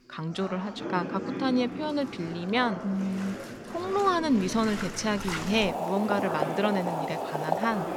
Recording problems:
household noises; loud; throughout; 6 dB below the speech
background chatter; loud; throughout; 4 voices, 9 dB below the speech

